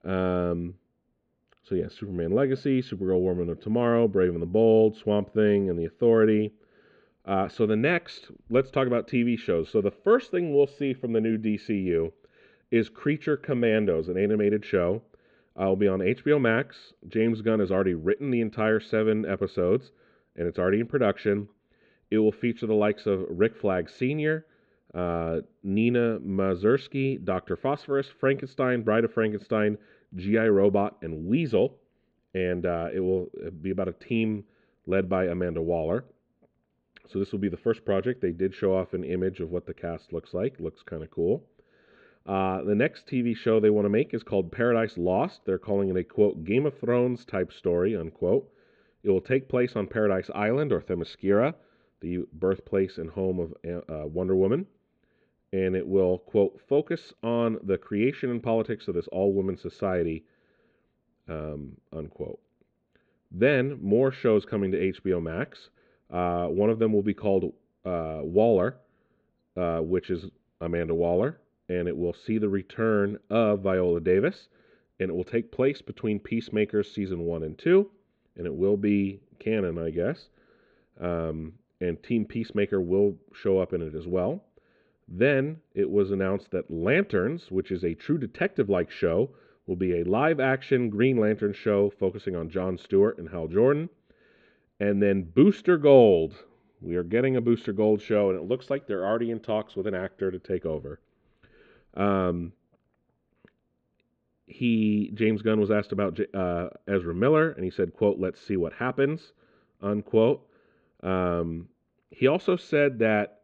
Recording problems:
muffled; slightly; fading above 4 kHz

